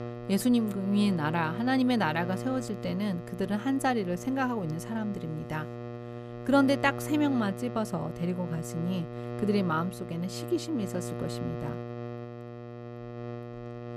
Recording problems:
electrical hum; noticeable; throughout; 60 Hz, 10 dB below the speech

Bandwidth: 14.5 kHz